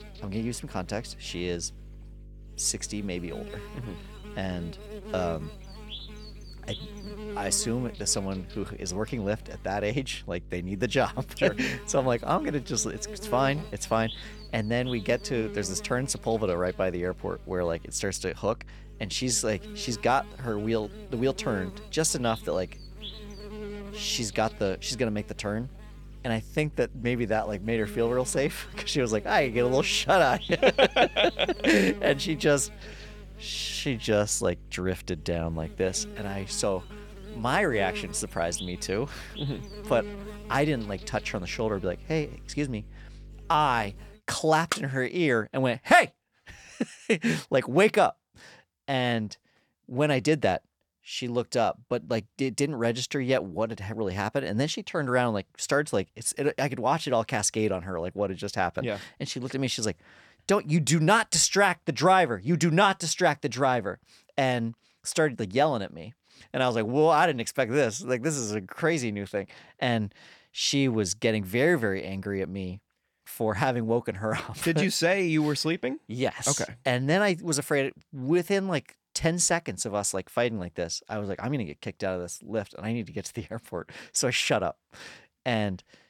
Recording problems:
electrical hum; noticeable; until 44 s; 50 Hz, 20 dB below the speech

